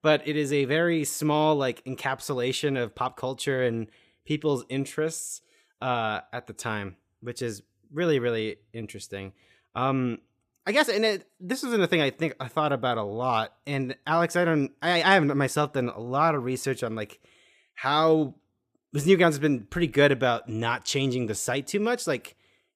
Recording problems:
none

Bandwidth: 15 kHz